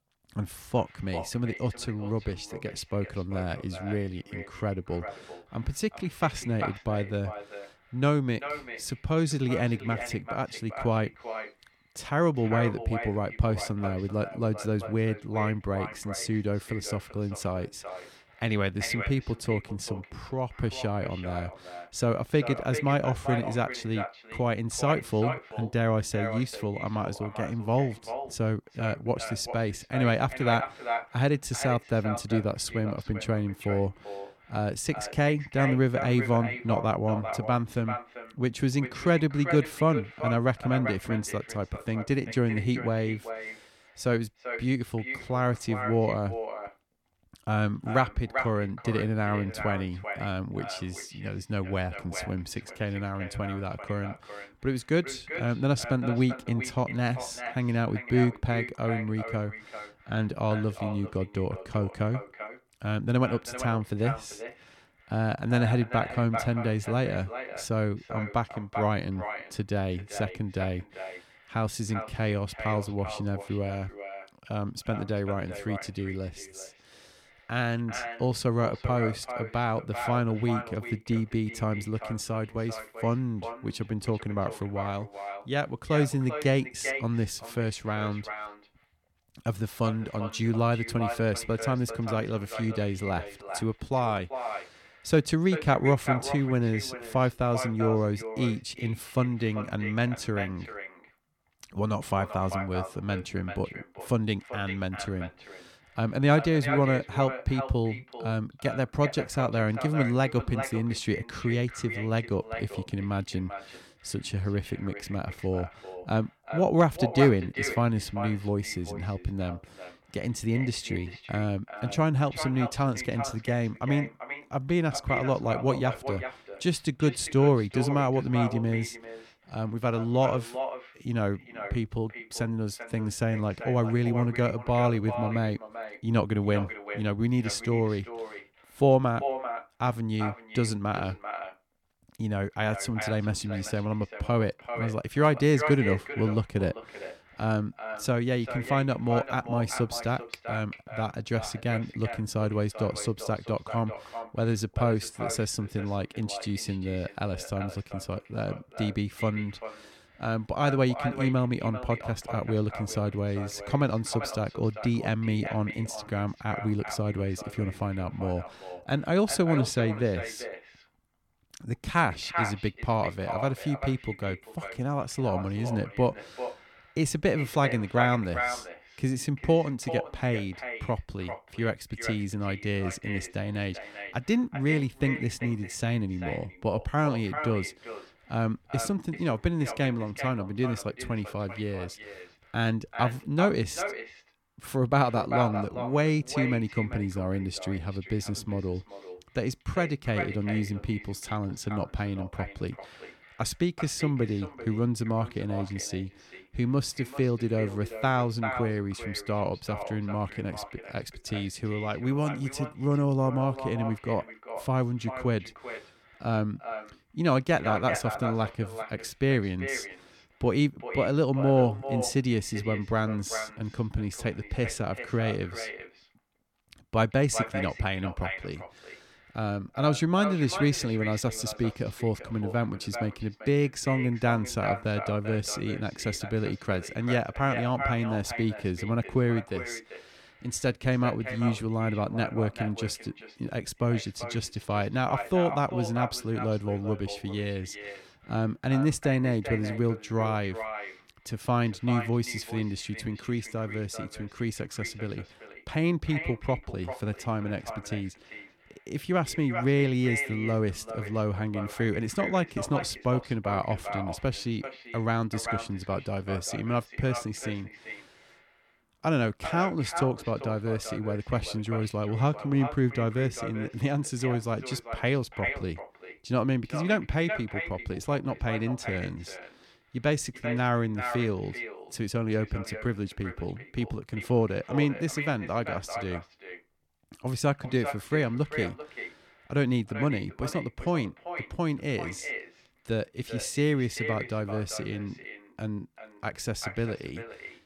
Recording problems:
echo of what is said; strong; throughout; 390 ms later, 9 dB below the speech

